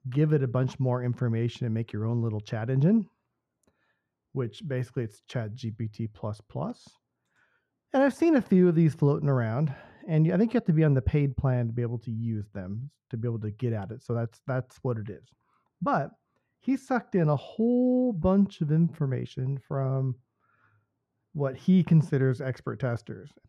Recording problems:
muffled; very; fading above 2.5 kHz

